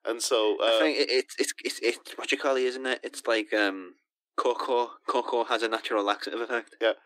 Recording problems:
thin; somewhat; fading below 300 Hz

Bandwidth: 15.5 kHz